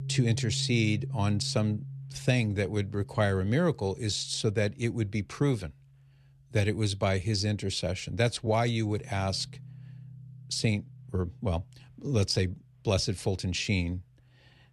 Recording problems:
background music; noticeable; throughout; 15 dB below the speech

